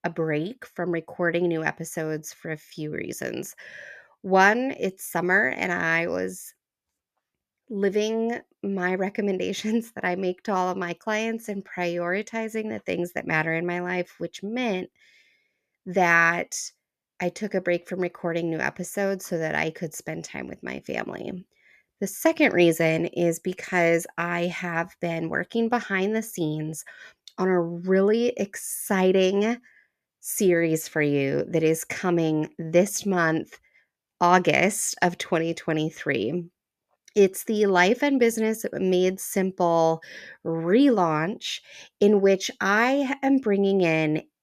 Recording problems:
none

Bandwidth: 14.5 kHz